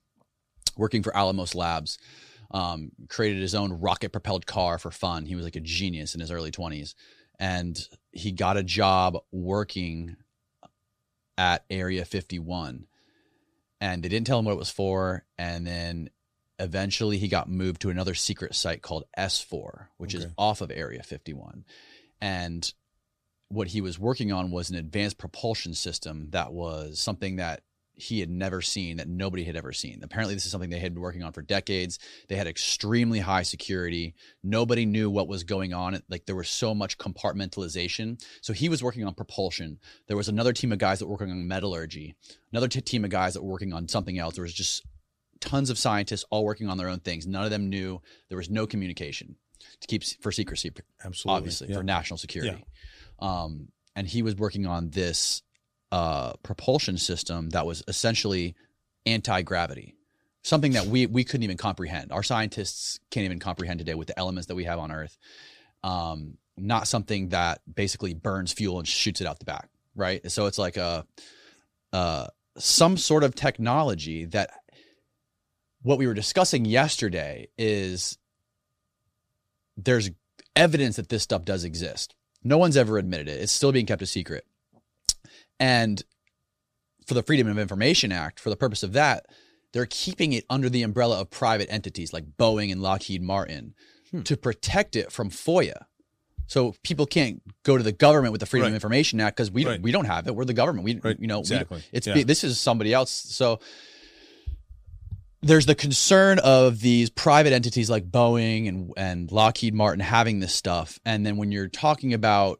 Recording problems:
none

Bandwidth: 14.5 kHz